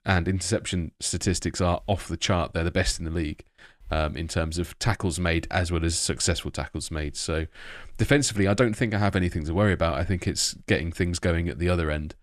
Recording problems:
none

